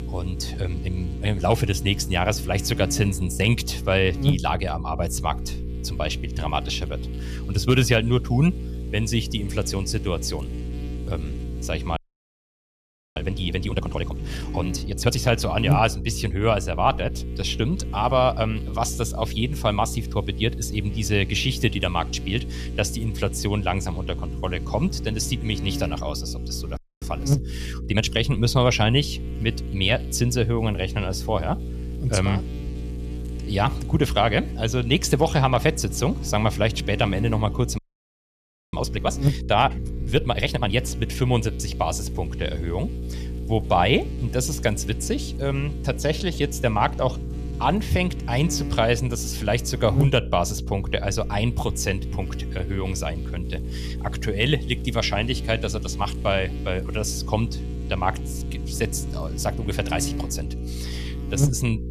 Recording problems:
electrical hum; noticeable; throughout; 60 Hz, 15 dB below the speech
audio freezing; at 12 s for 1 s, at 27 s and at 38 s for 1 s

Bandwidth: 14.5 kHz